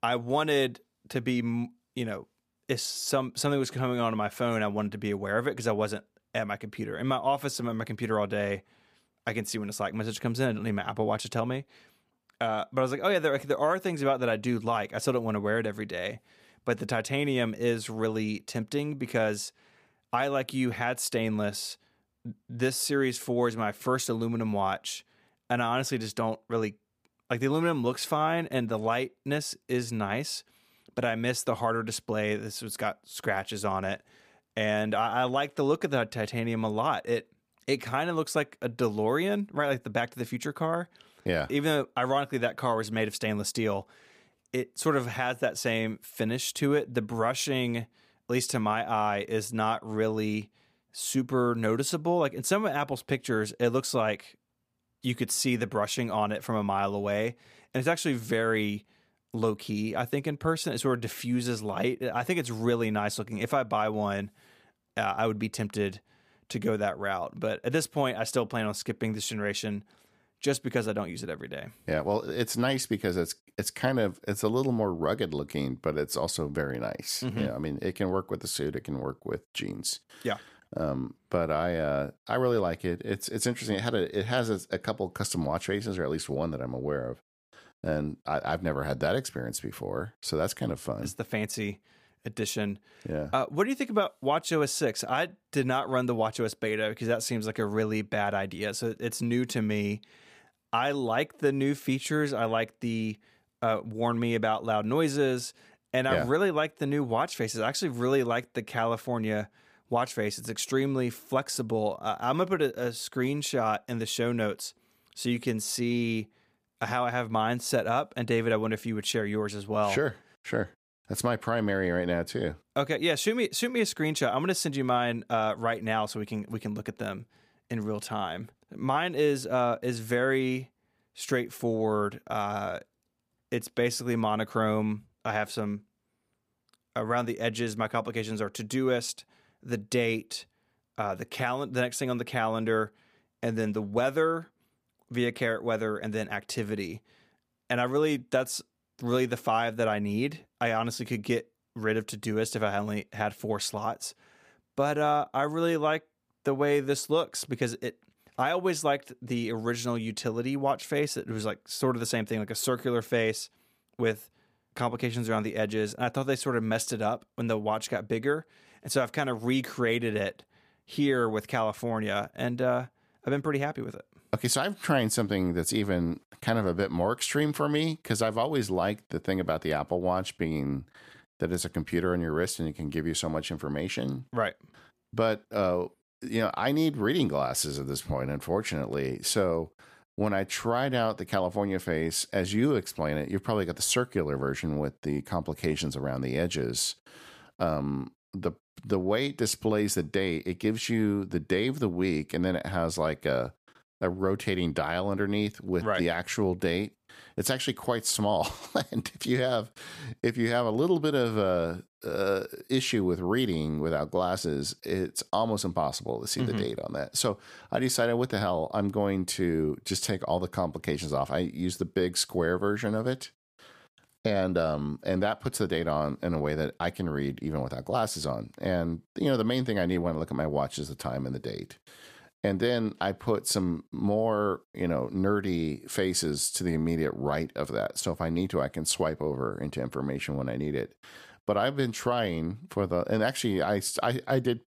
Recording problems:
none

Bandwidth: 15 kHz